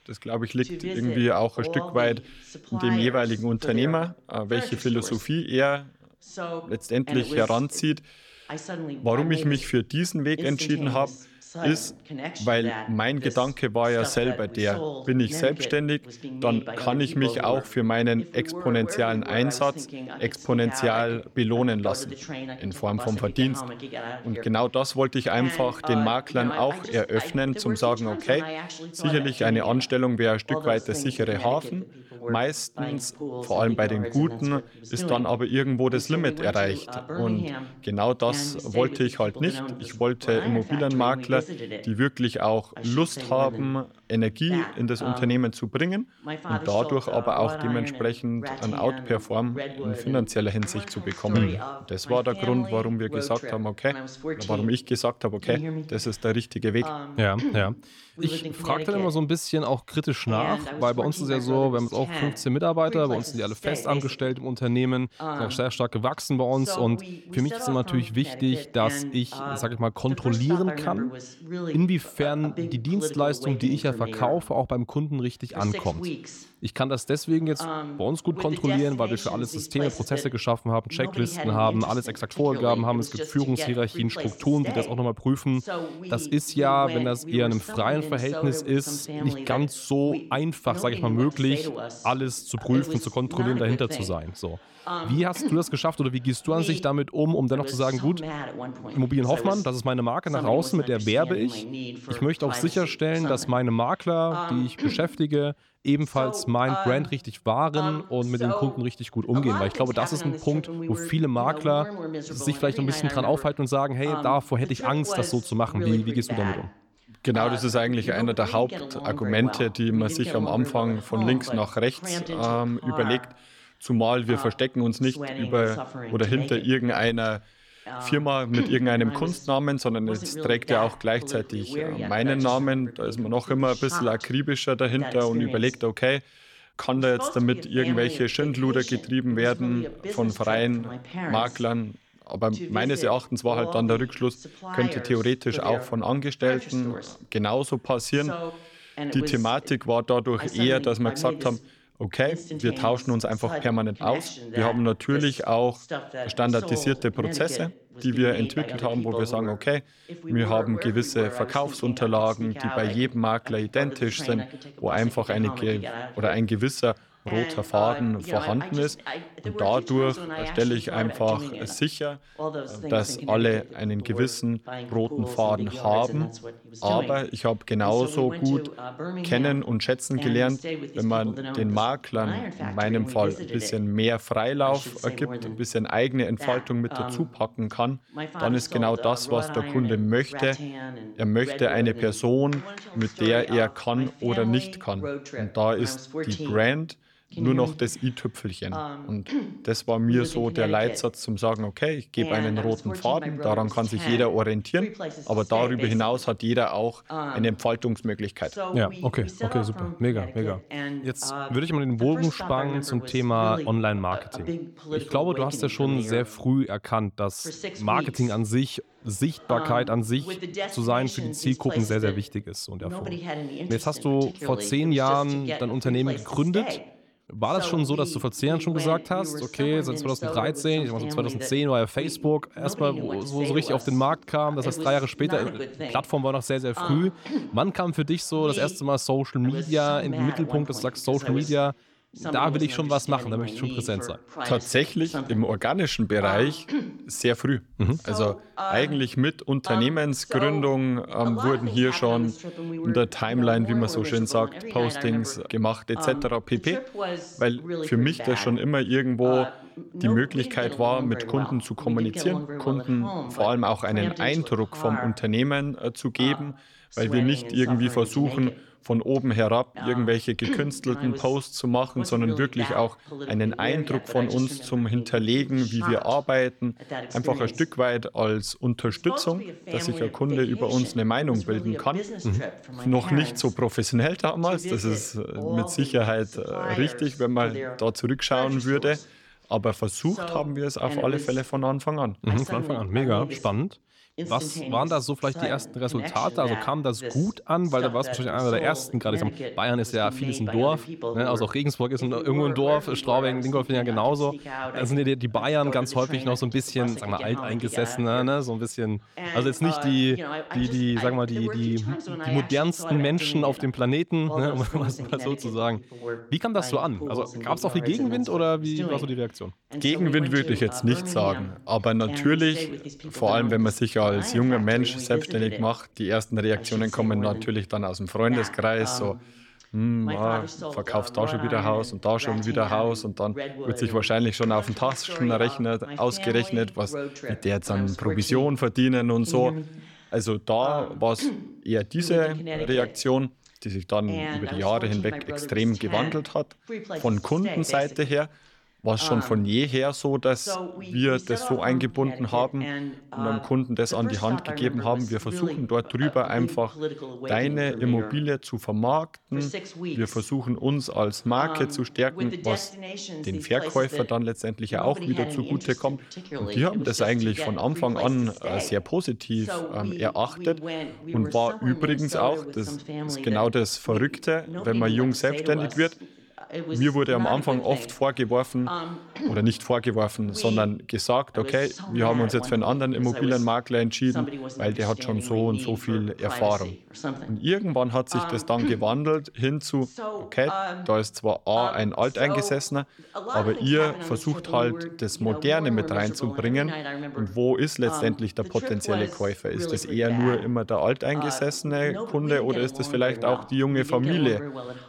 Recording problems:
voice in the background; loud; throughout; 9 dB below the speech

